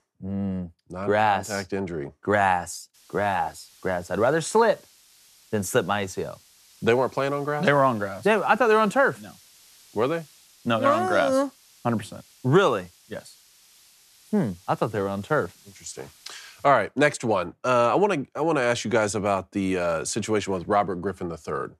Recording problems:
hiss; faint; from 3 to 17 s; 30 dB below the speech

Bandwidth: 13.5 kHz